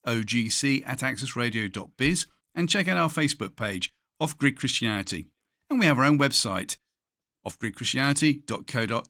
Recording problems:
garbled, watery; slightly; nothing above 17 kHz

